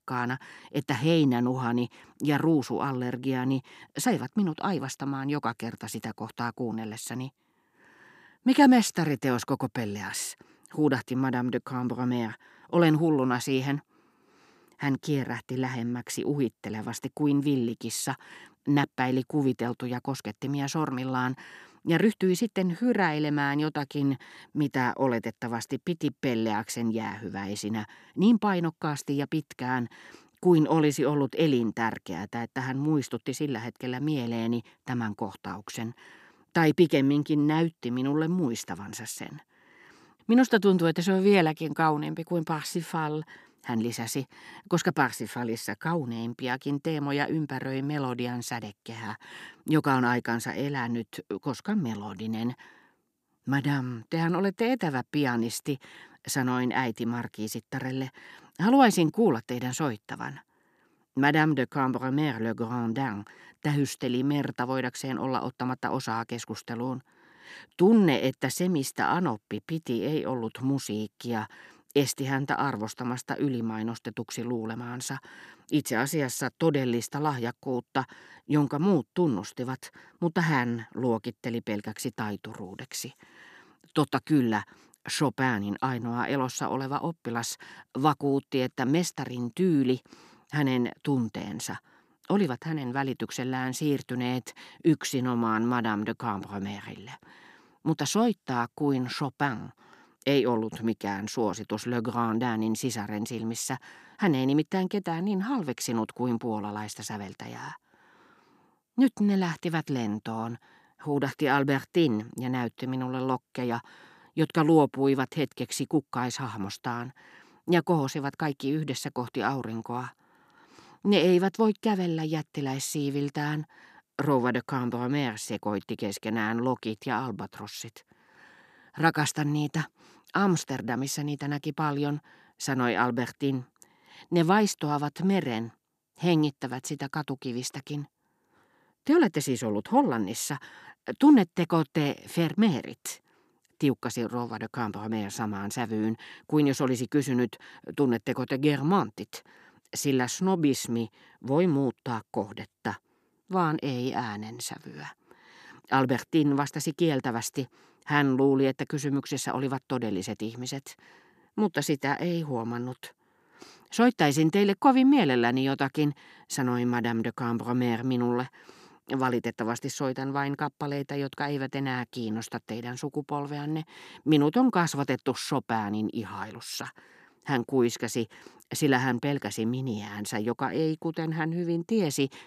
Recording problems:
none

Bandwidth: 14 kHz